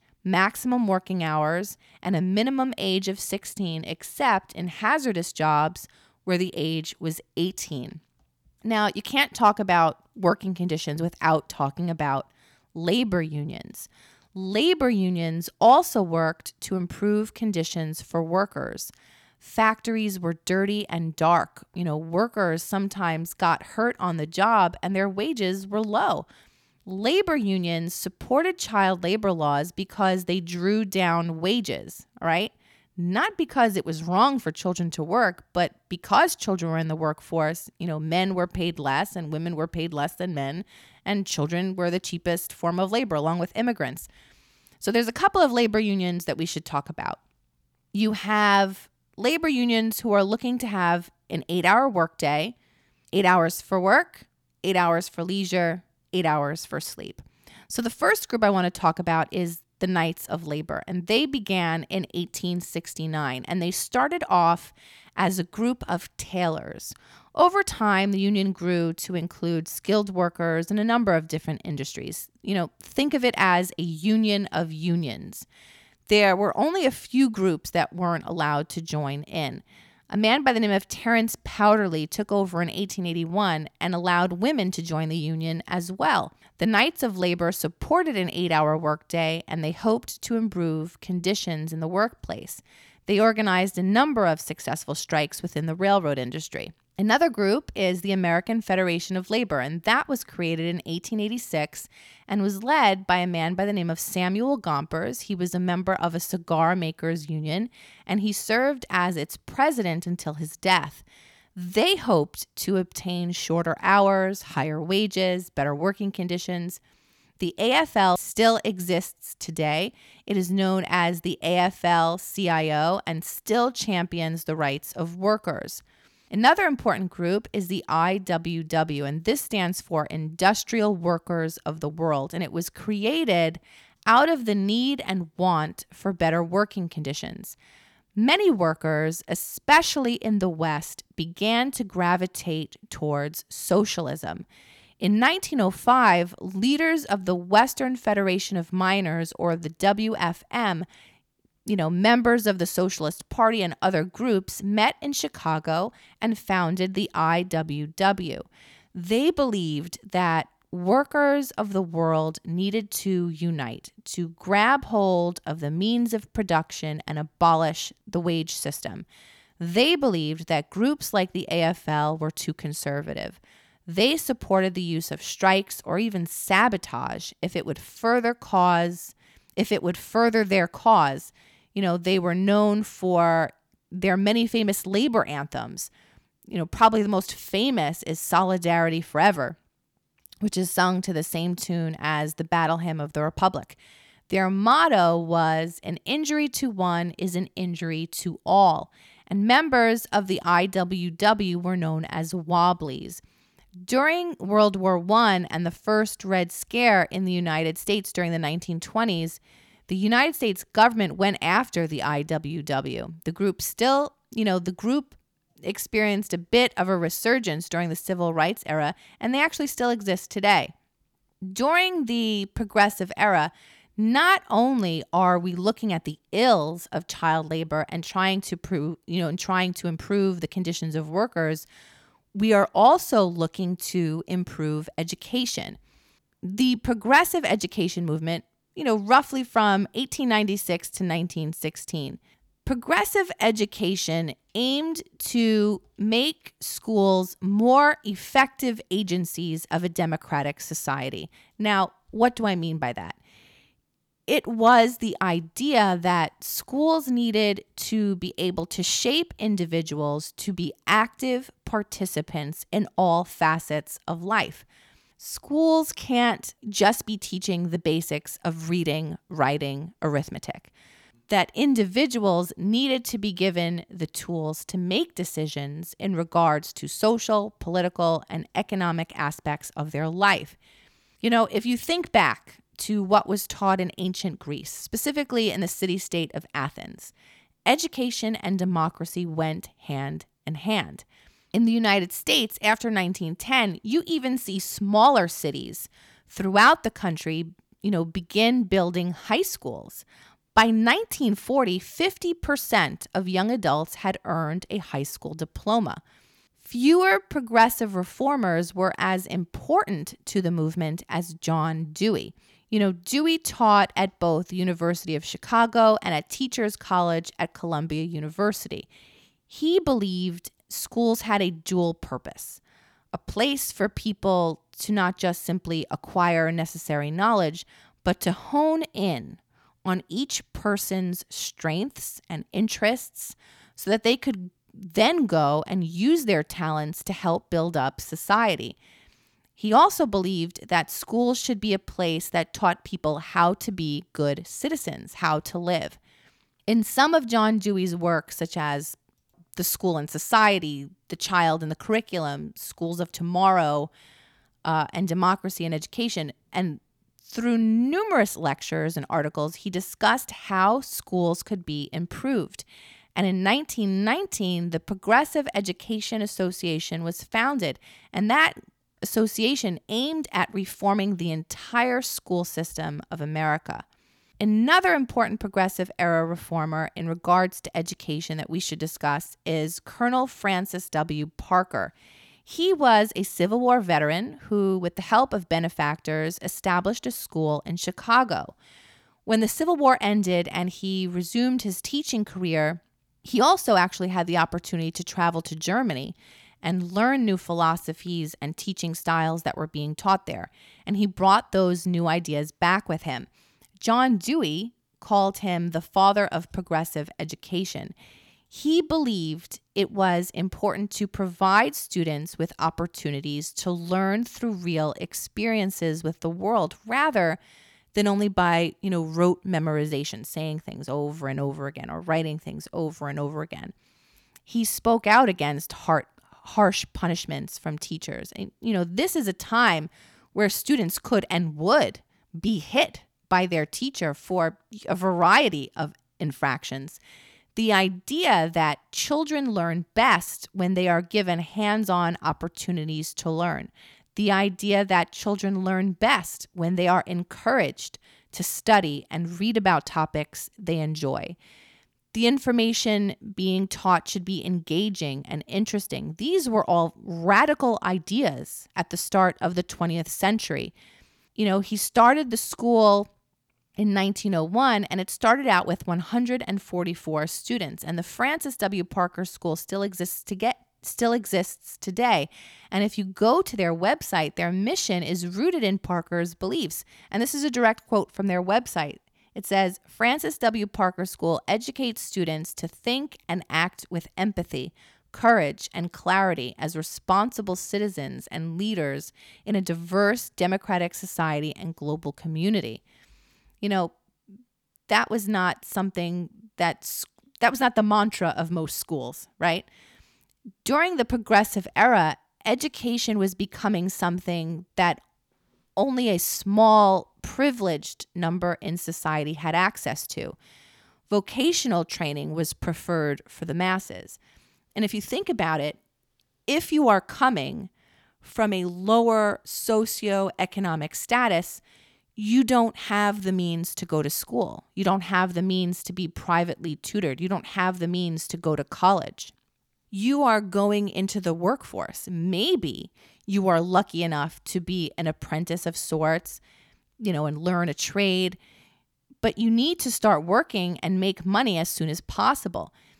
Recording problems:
none

